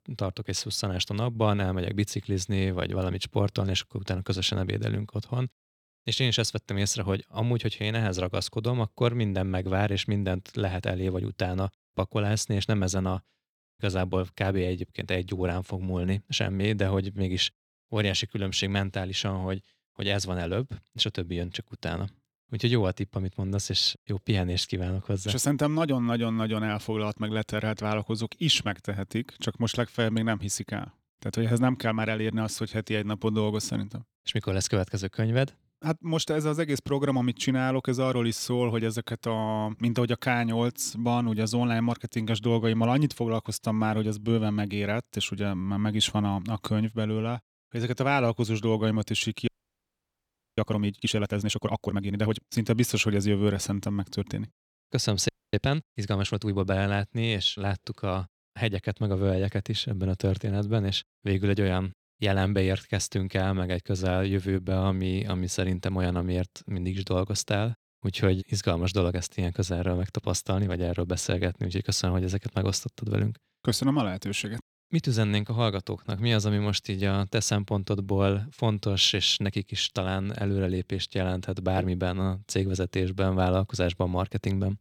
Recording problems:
audio freezing; at 49 s for 1 s and at 55 s

